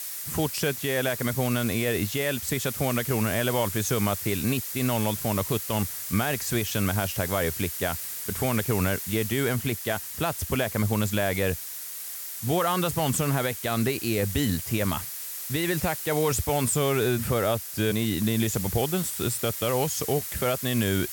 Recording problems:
hiss; loud; throughout; 5 dB below the speech

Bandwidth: 17 kHz